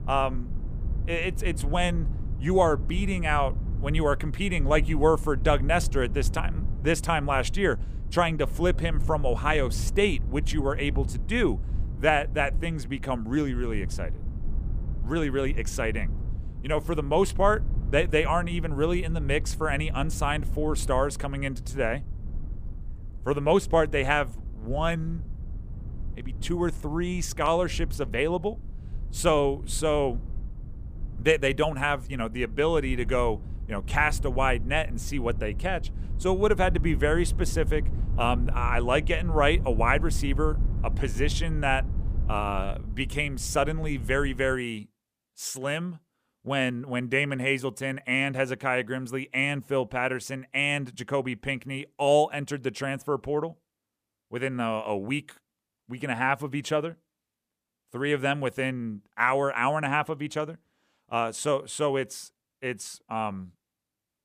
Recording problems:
low rumble; faint; until 45 s; 20 dB below the speech

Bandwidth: 15 kHz